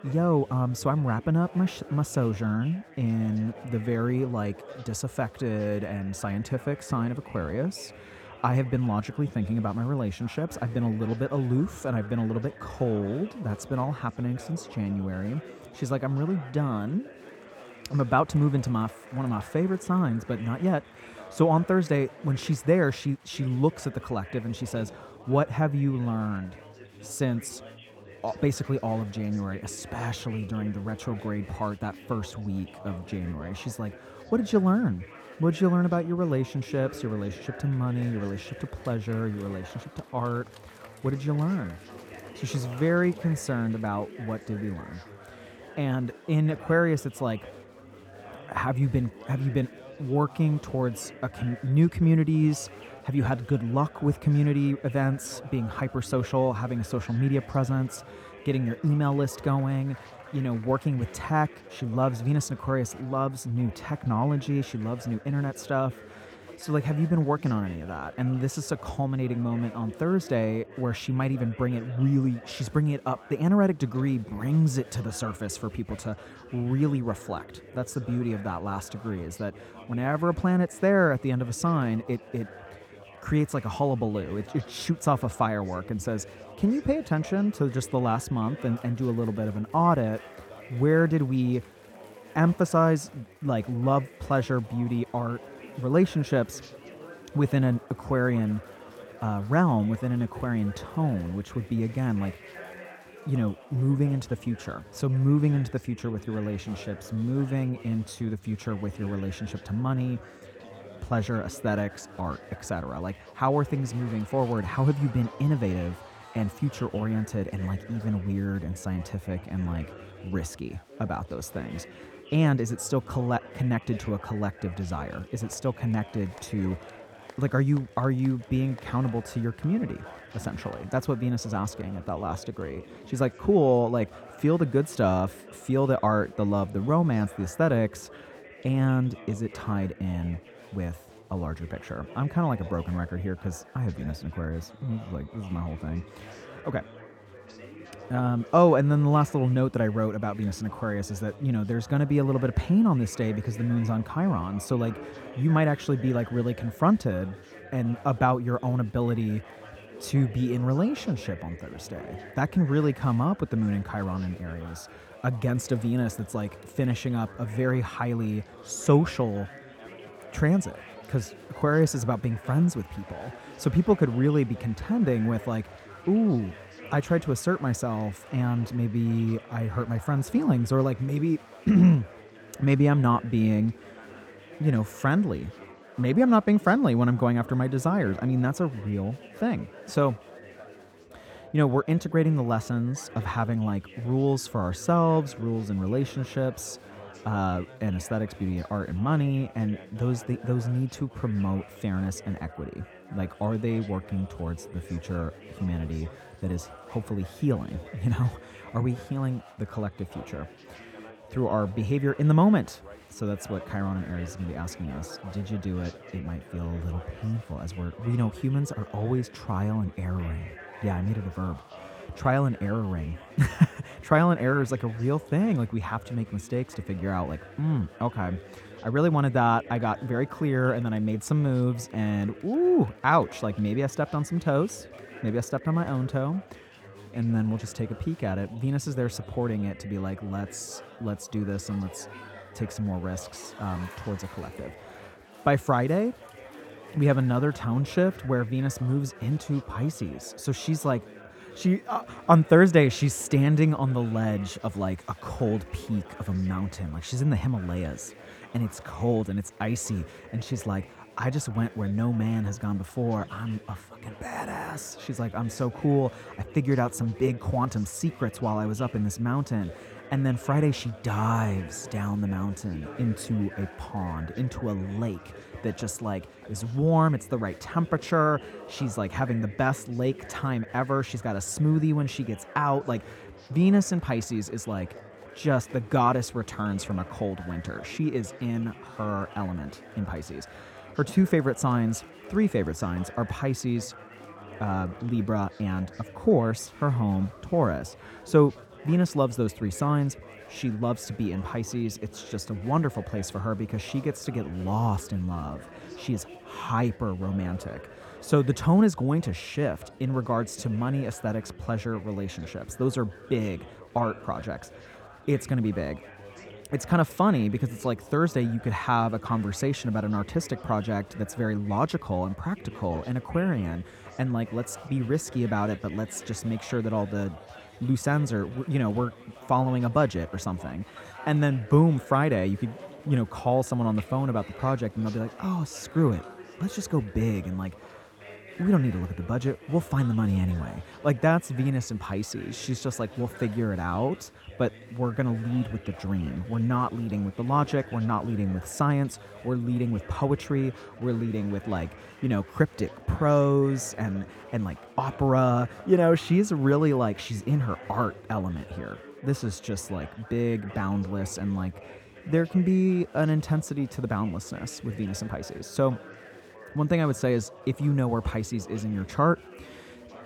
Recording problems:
chatter from many people; noticeable; throughout; 20 dB below the speech

